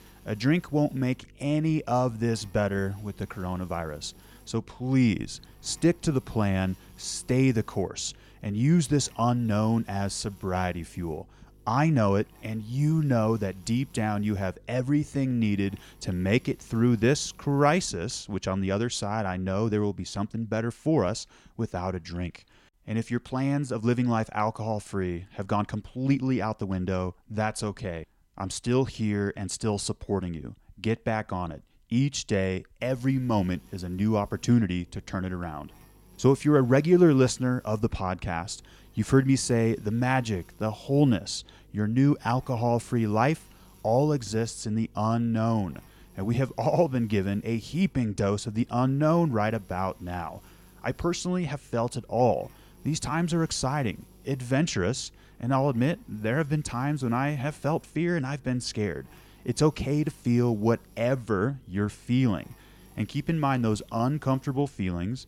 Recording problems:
electrical hum; faint; until 18 s and from 33 s on; 50 Hz, 30 dB below the speech

